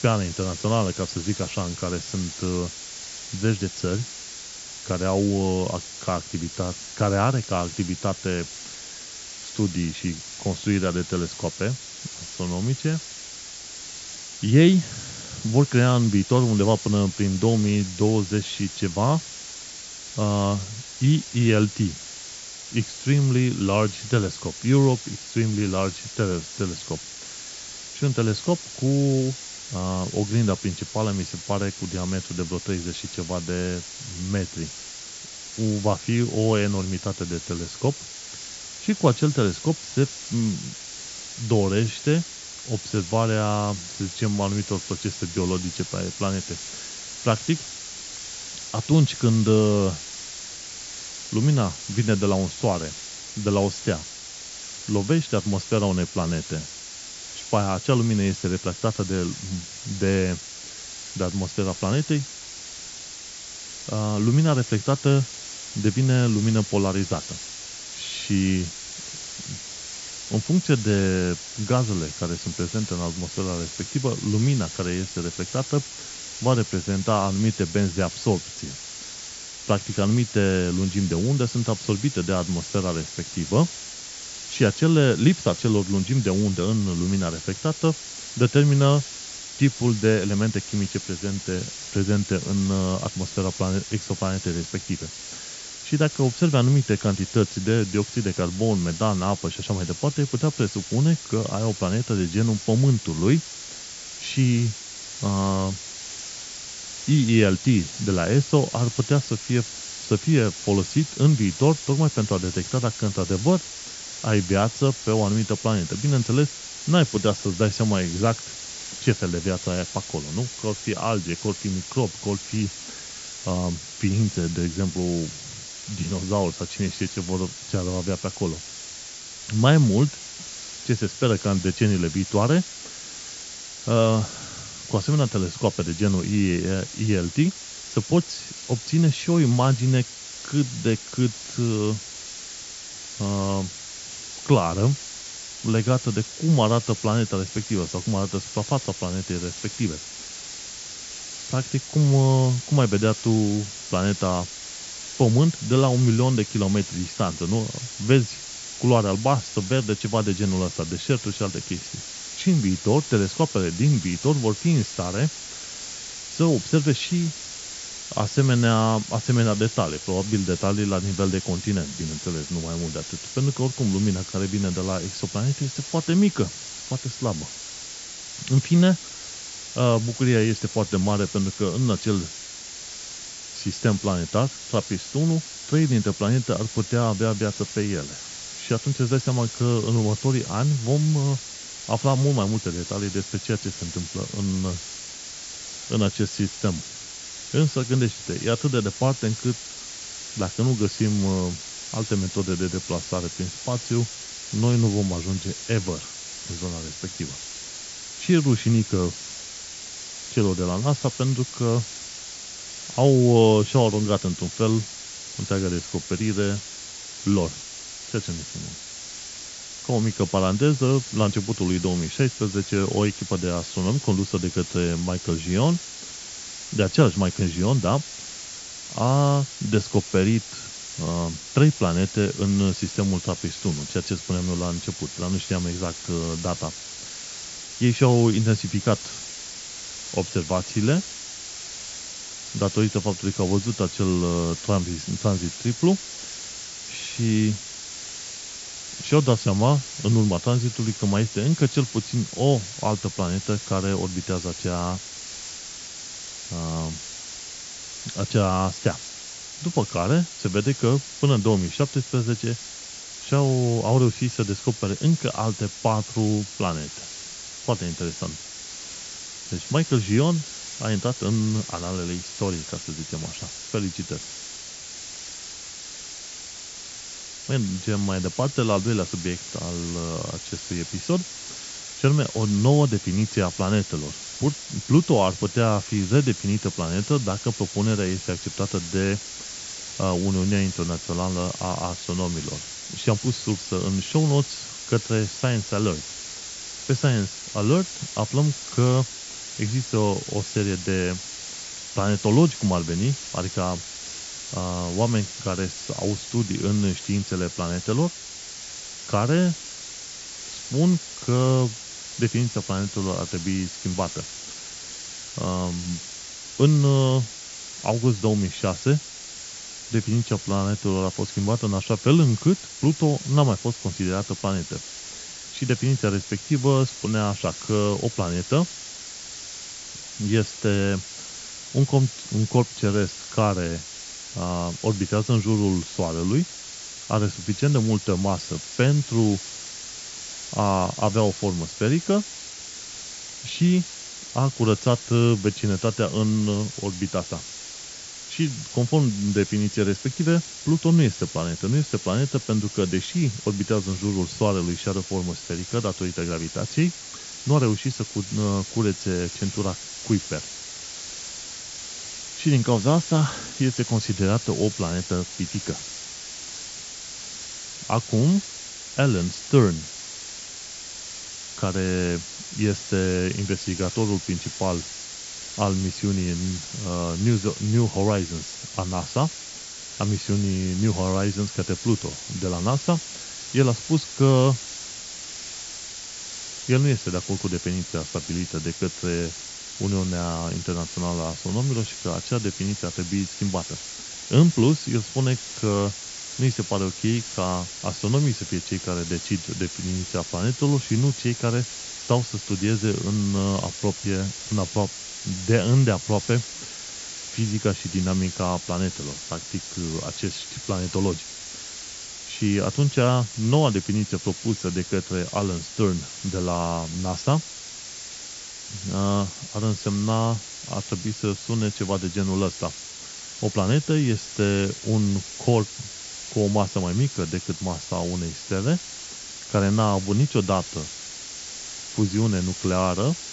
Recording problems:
high frequencies cut off; noticeable; nothing above 8 kHz
hiss; noticeable; throughout; 10 dB below the speech

